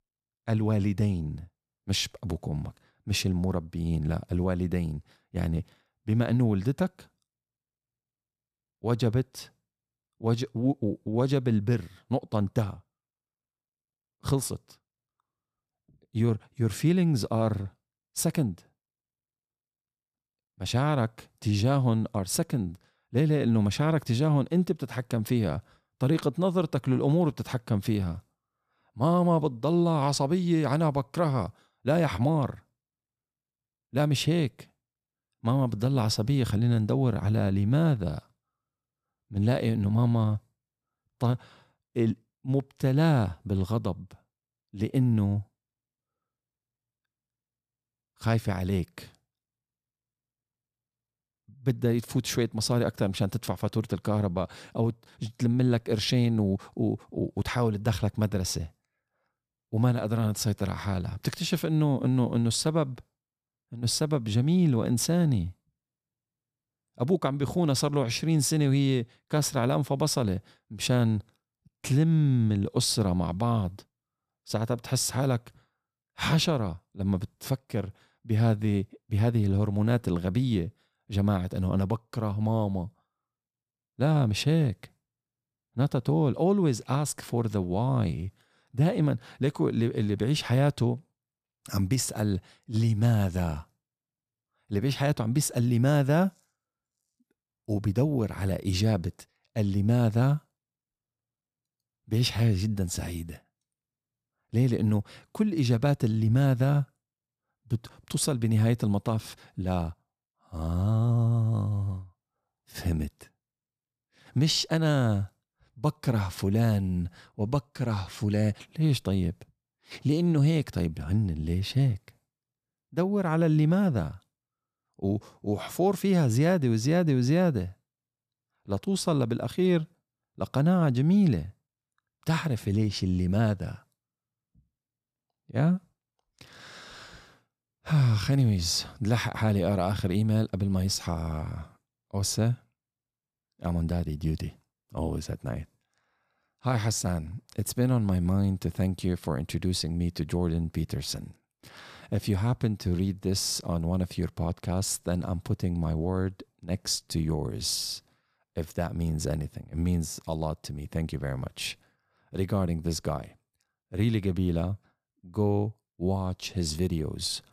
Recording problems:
none

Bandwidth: 14.5 kHz